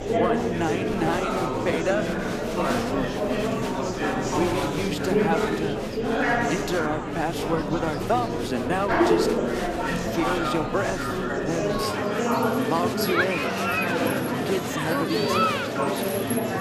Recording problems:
murmuring crowd; very loud; throughout; 4 dB above the speech

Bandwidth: 14.5 kHz